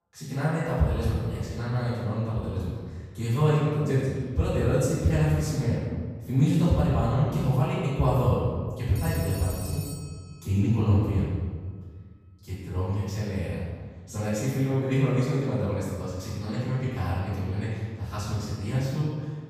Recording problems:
room echo; strong; dies away in 1.5 s
off-mic speech; far
phone ringing; faint; from 9 to 10 s; peak 10 dB below the speech

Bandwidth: 15 kHz